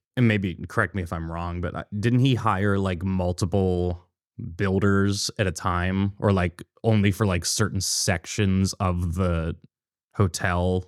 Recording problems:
none

